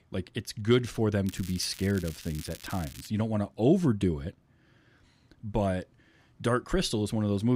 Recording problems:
crackling; noticeable; from 1.5 to 3 s; 15 dB below the speech
abrupt cut into speech; at the end

